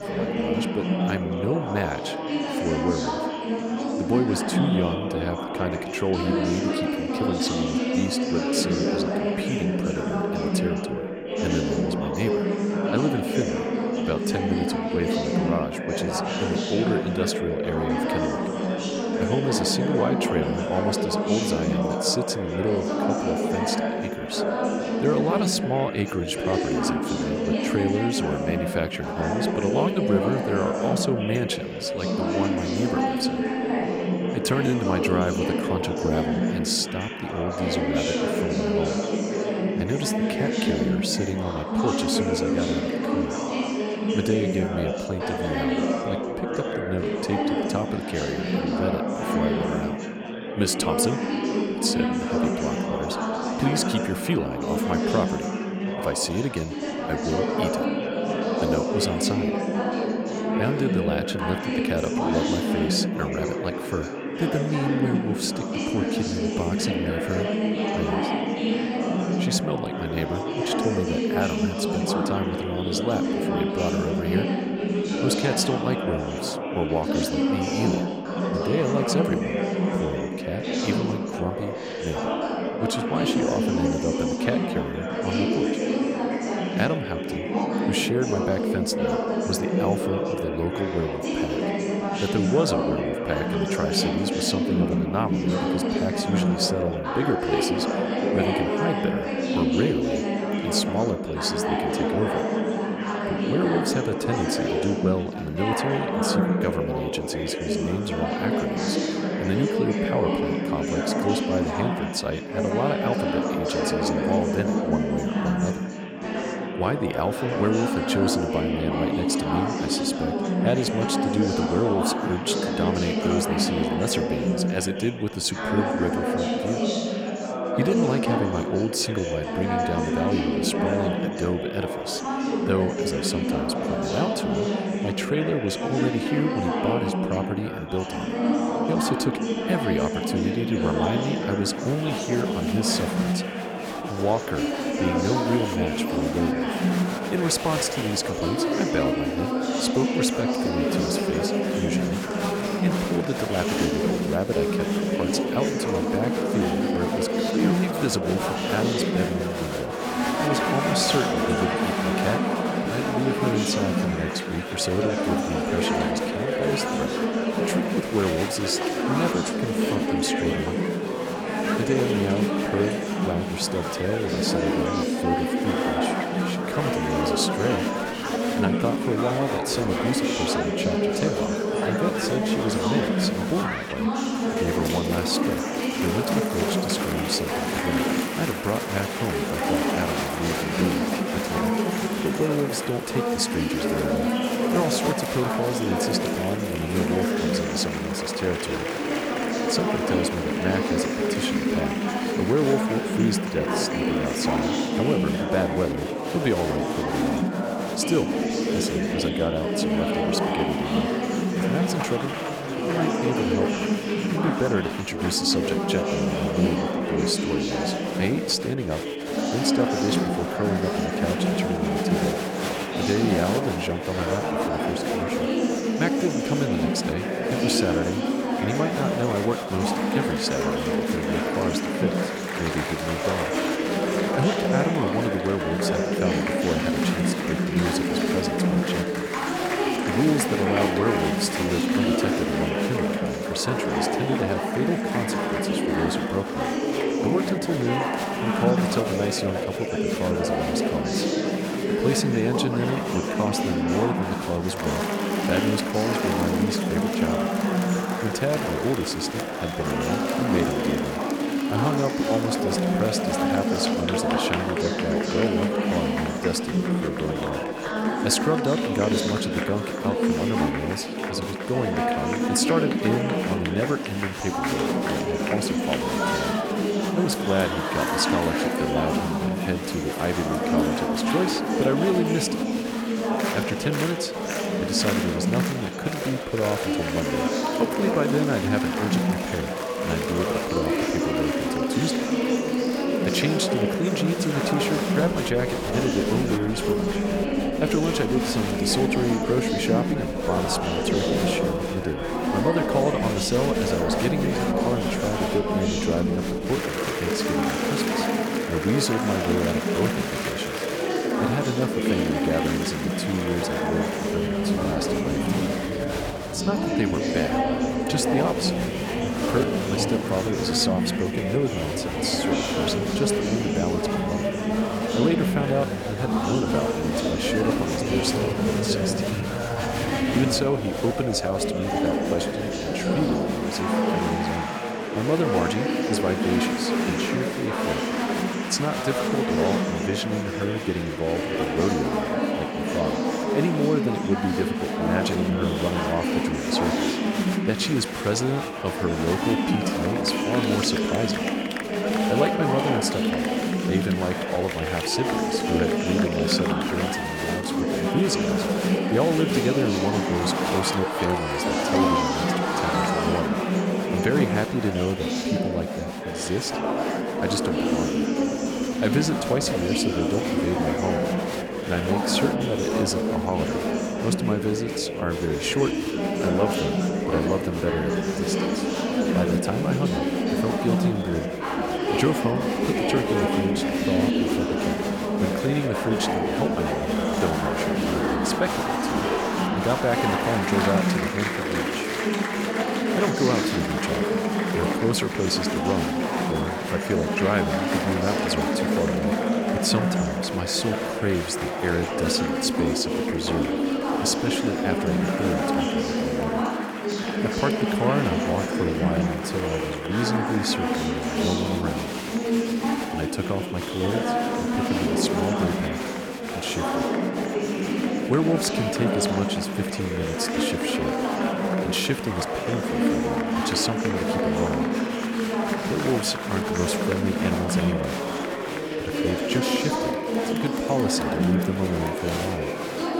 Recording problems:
chatter from many people; very loud; throughout; 3 dB above the speech

